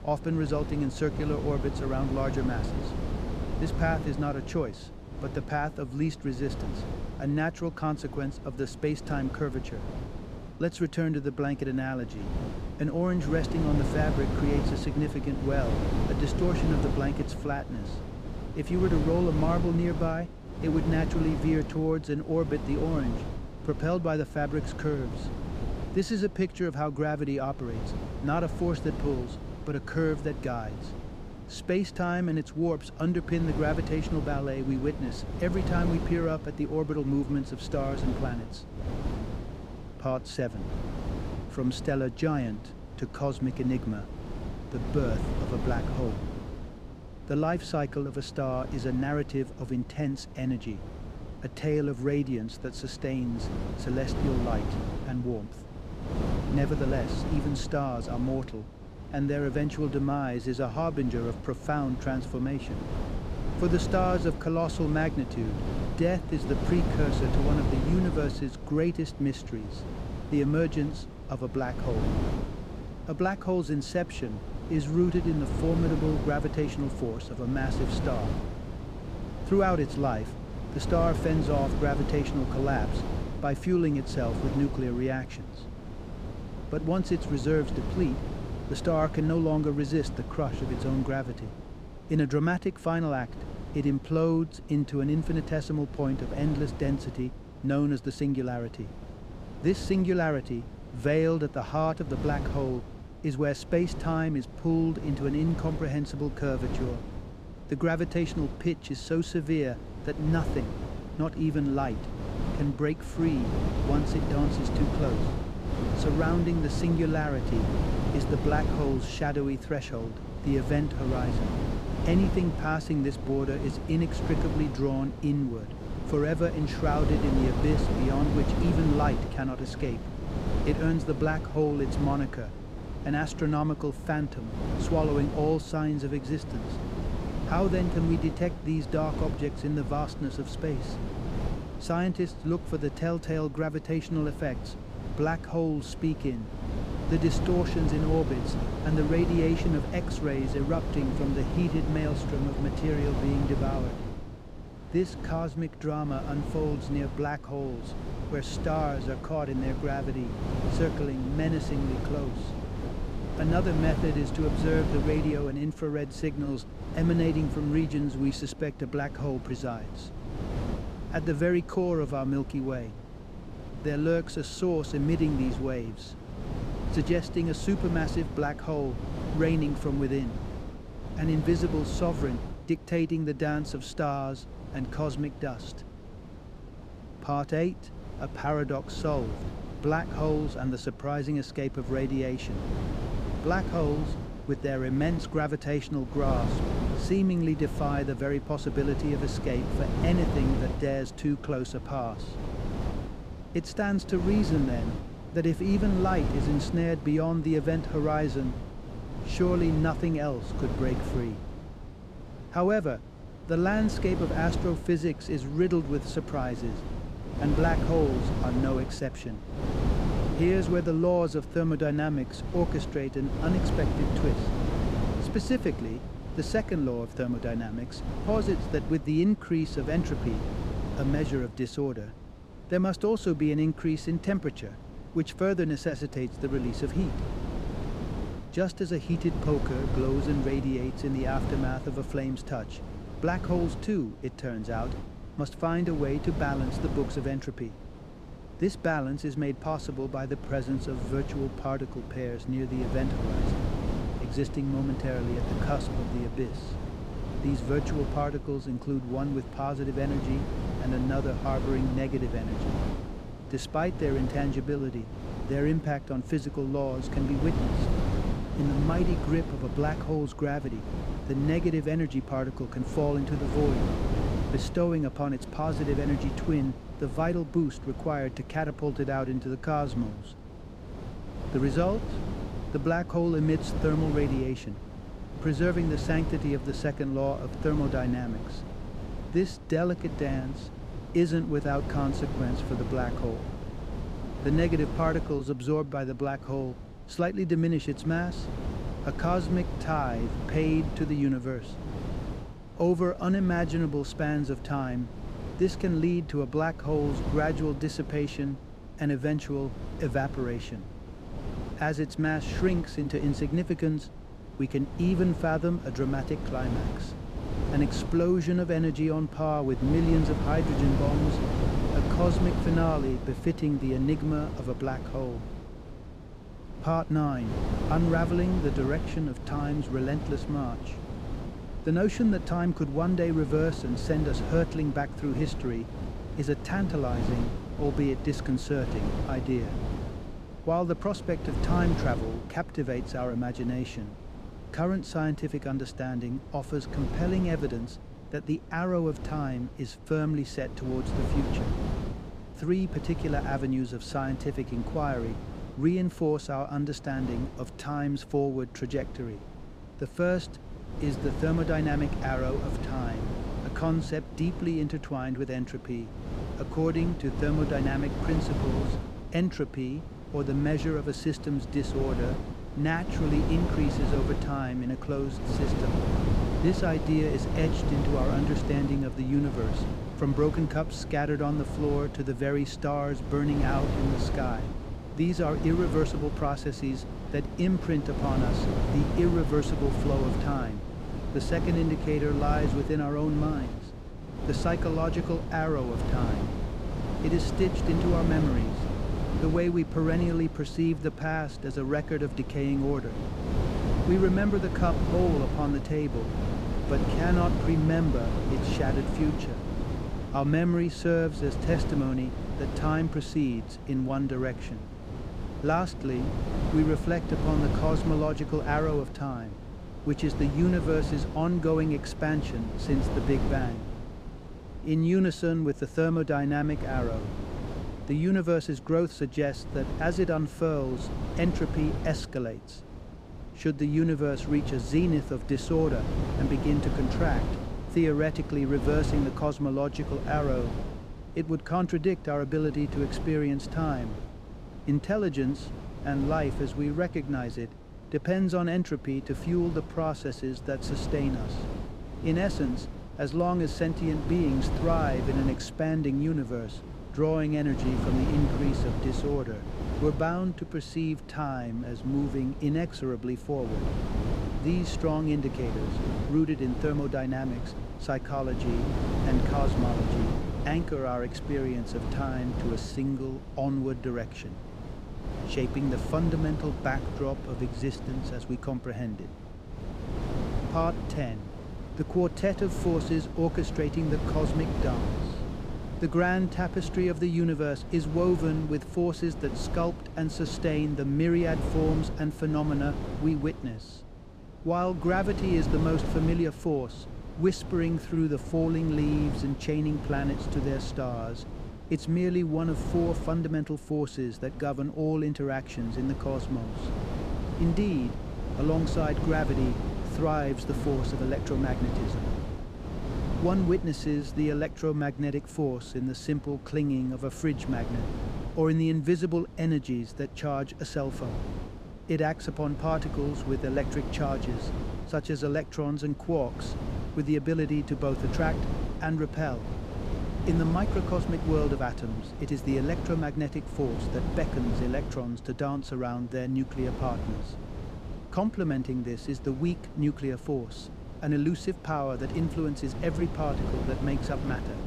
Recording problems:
wind noise on the microphone; heavy; 8 dB below the speech

